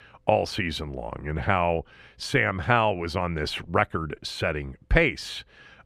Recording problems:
none

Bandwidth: 14.5 kHz